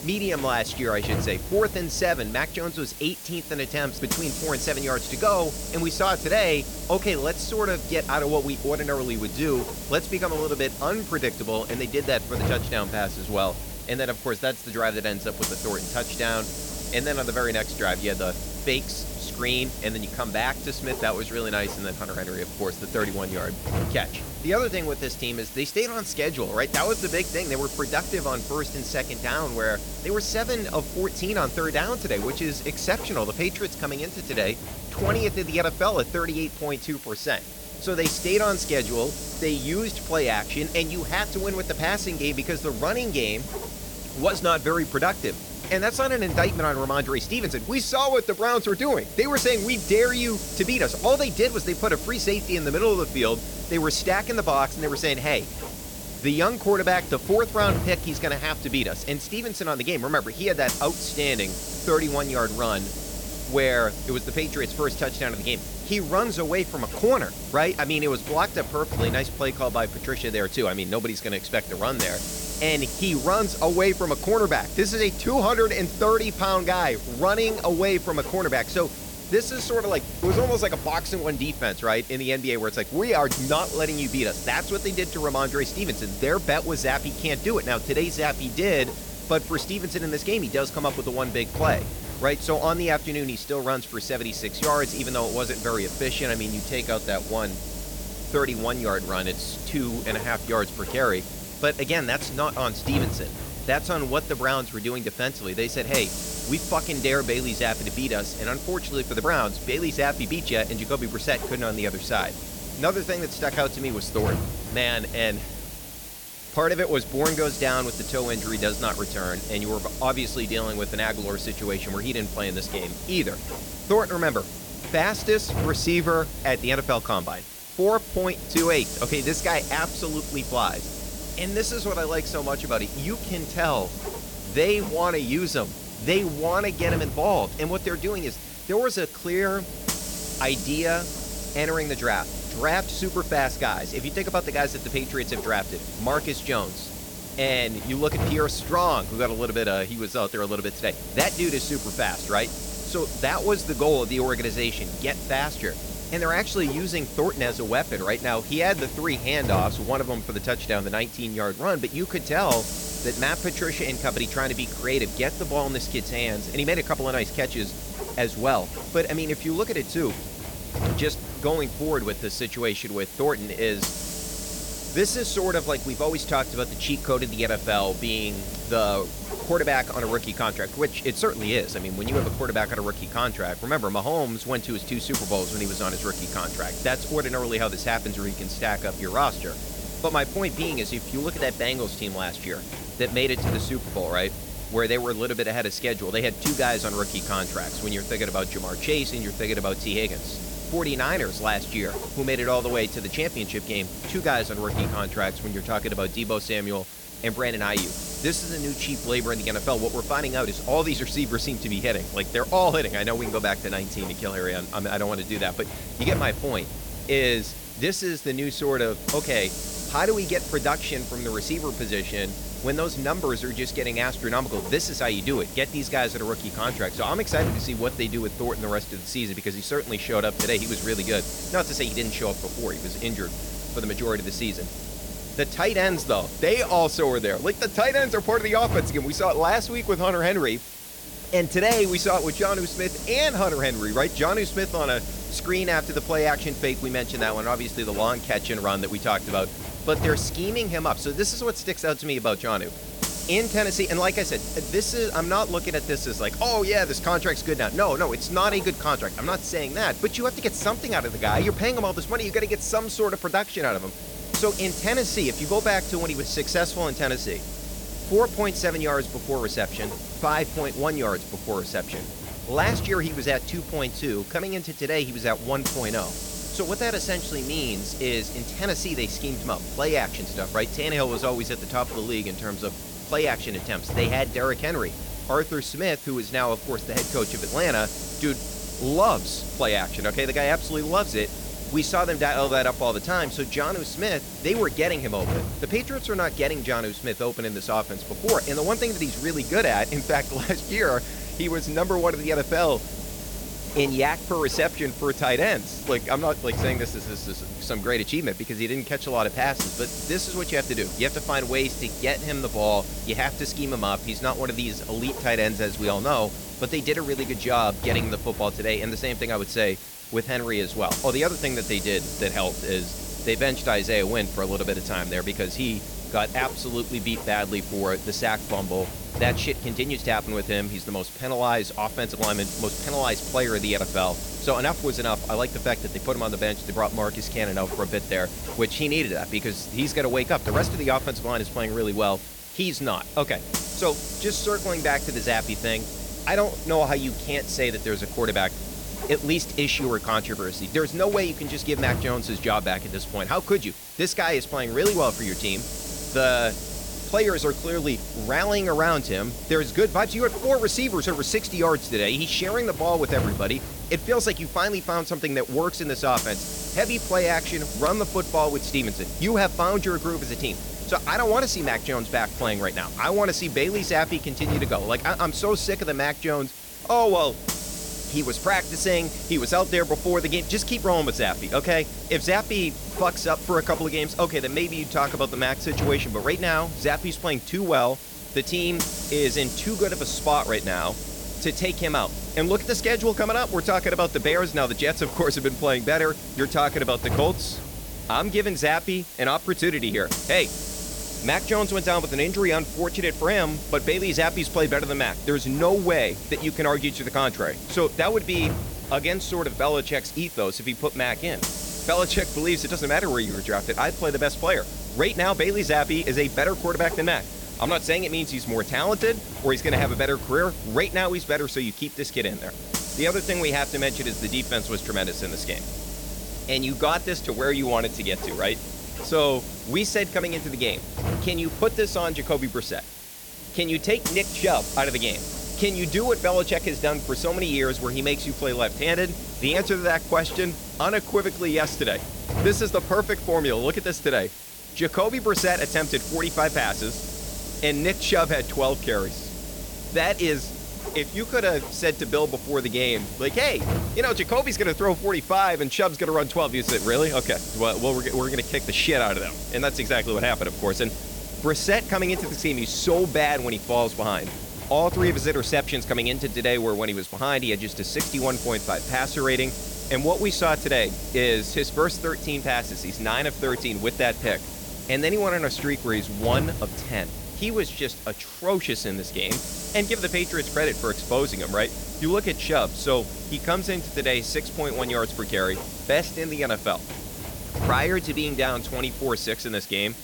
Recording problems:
hiss; loud; throughout; 7 dB below the speech

